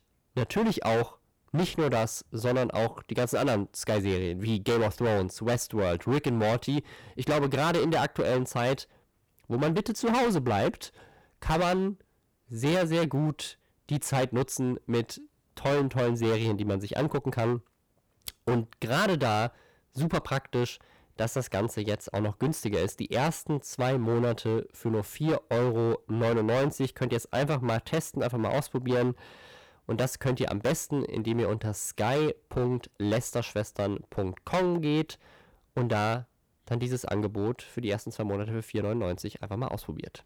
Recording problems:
distortion; heavy; 13% of the sound clipped

